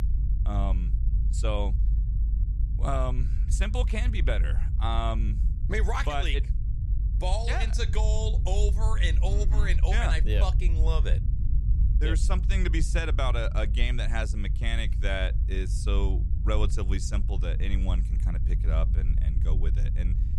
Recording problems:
low rumble; noticeable; throughout; 10 dB below the speech

